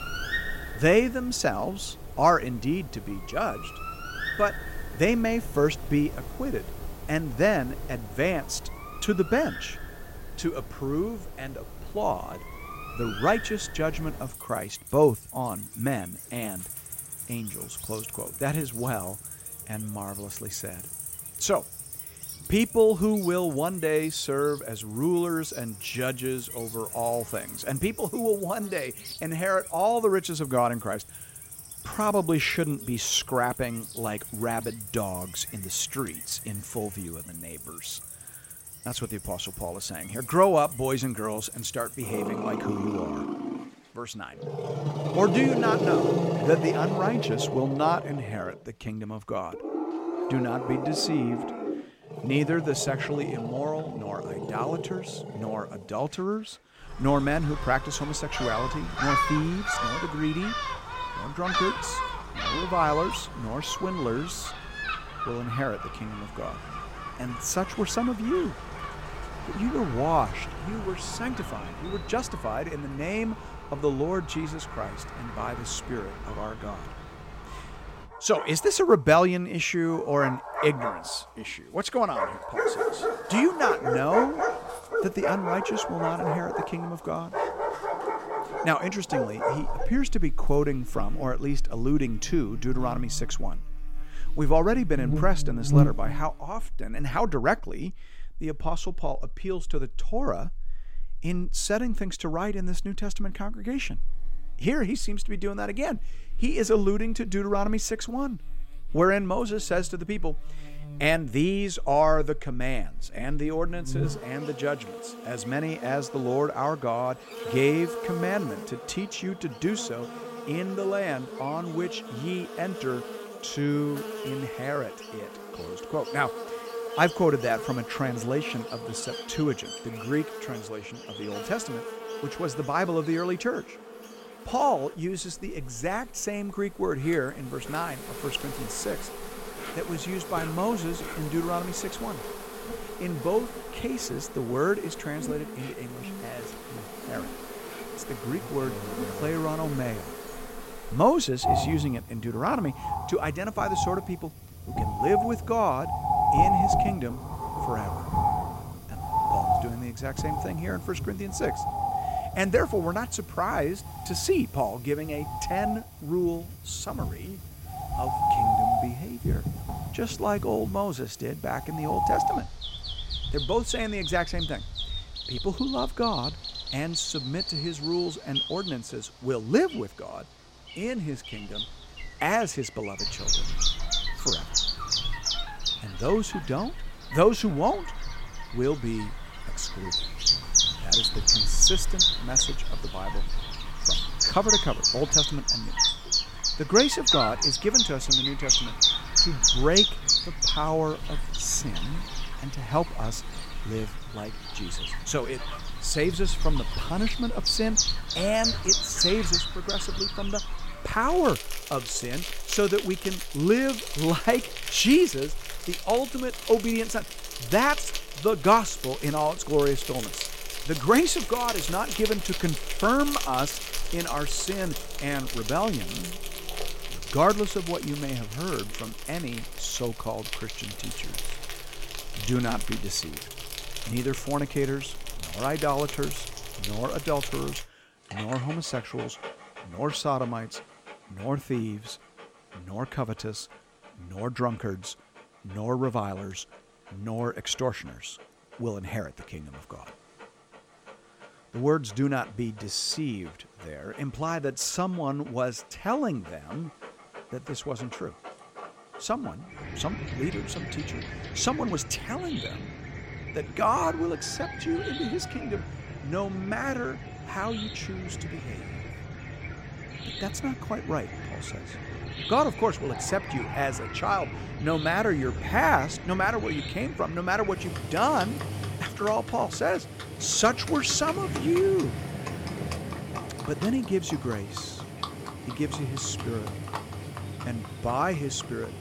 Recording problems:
animal sounds; loud; throughout; 3 dB below the speech

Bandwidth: 16 kHz